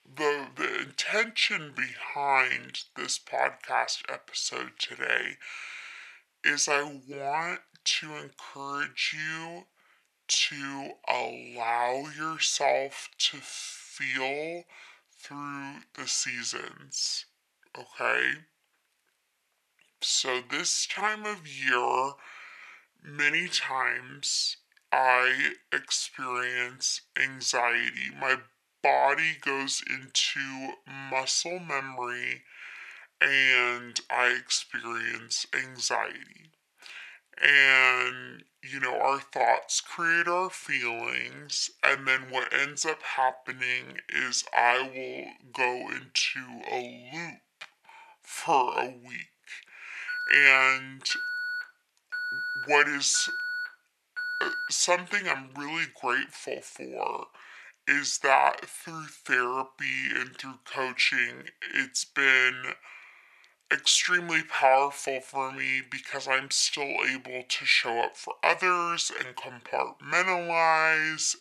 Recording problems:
thin; very; fading below 500 Hz
wrong speed and pitch; too slow and too low; 0.6 times normal speed
alarm; noticeable; from 50 to 55 s; peak 5 dB below the speech

